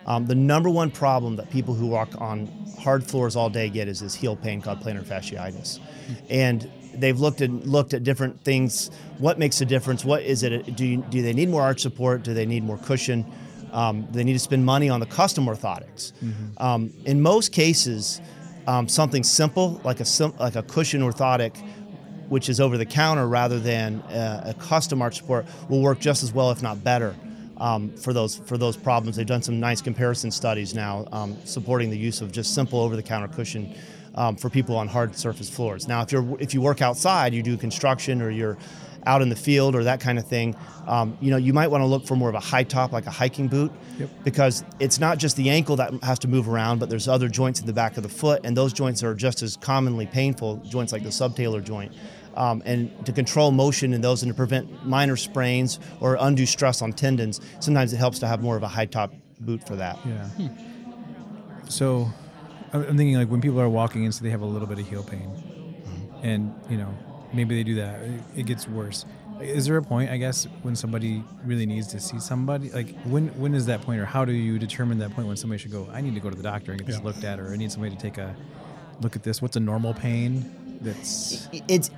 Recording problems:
chatter from many people; noticeable; throughout; 20 dB below the speech

